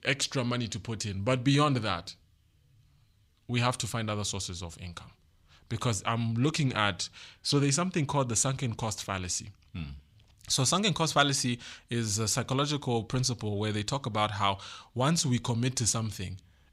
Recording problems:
none

